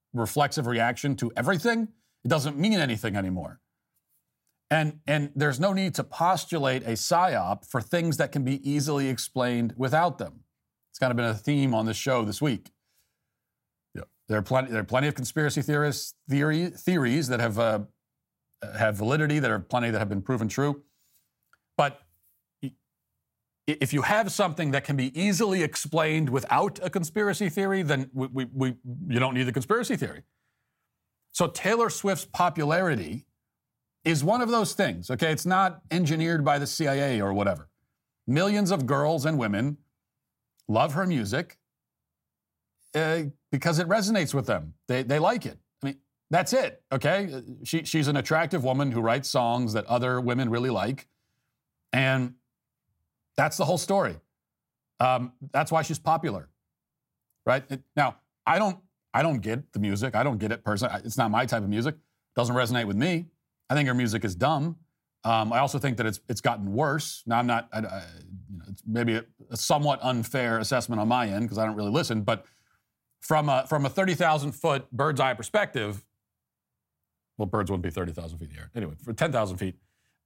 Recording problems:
none

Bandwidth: 16 kHz